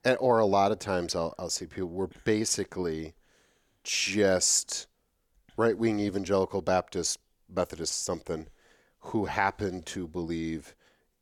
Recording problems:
none

